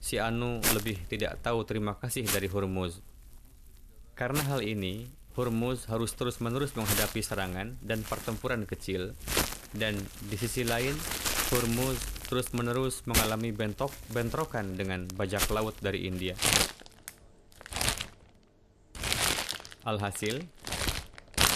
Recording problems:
household noises; very loud; throughout; 1 dB above the speech

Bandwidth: 14 kHz